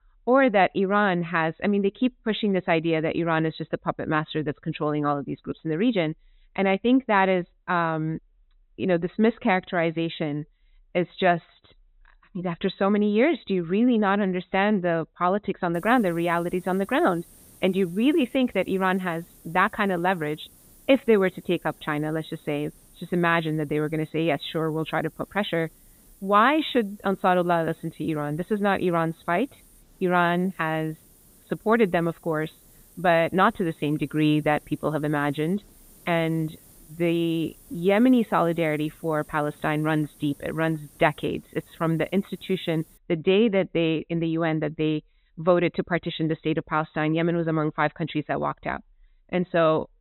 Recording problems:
high frequencies cut off; severe; nothing above 4 kHz
hiss; faint; from 16 to 43 s; 25 dB below the speech

